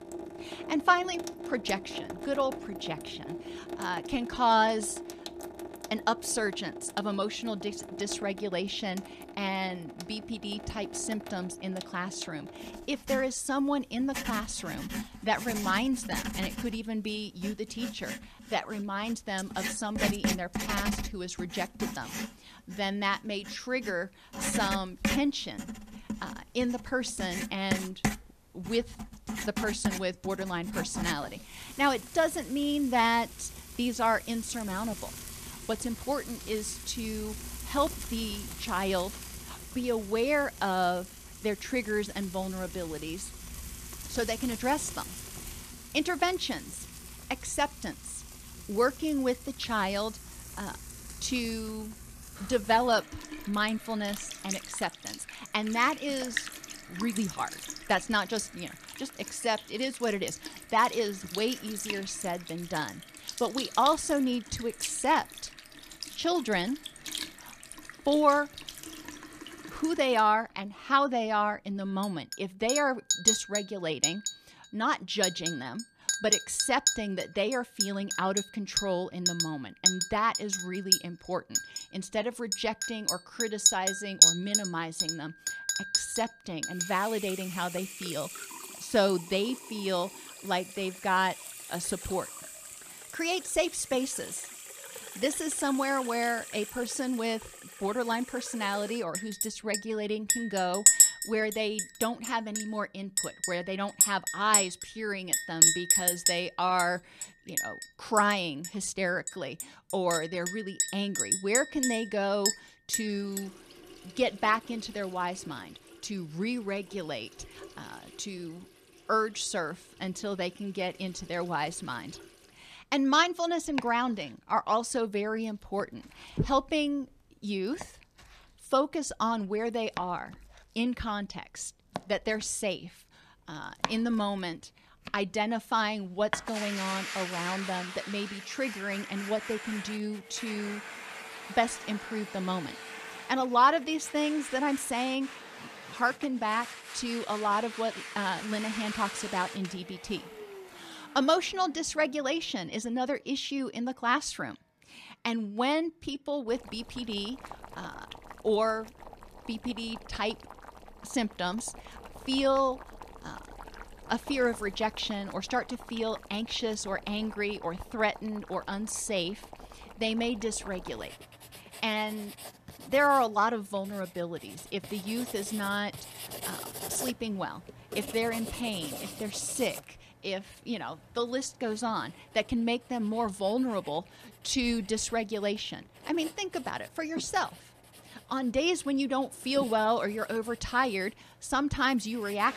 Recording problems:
household noises; loud; throughout; 2 dB below the speech

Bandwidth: 14.5 kHz